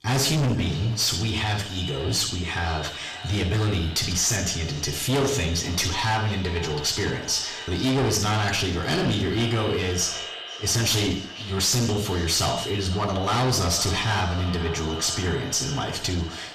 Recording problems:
distortion; heavy; 6 dB below the speech
echo of what is said; strong; throughout; 500 ms later, 10 dB below the speech
off-mic speech; far
room echo; slight; dies away in 0.5 s

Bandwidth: 14.5 kHz